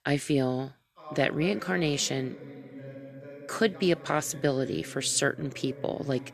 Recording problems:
voice in the background; noticeable; throughout; 15 dB below the speech

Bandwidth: 13.5 kHz